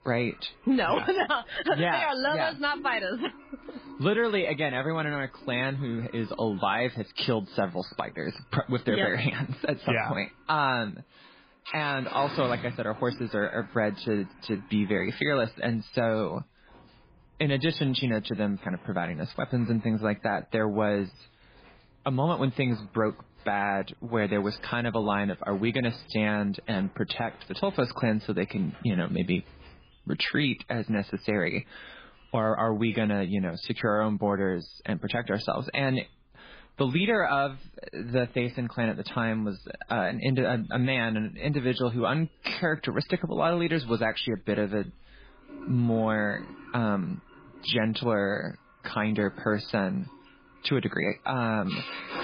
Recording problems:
garbled, watery; badly
household noises; noticeable; throughout; 20 dB below the speech

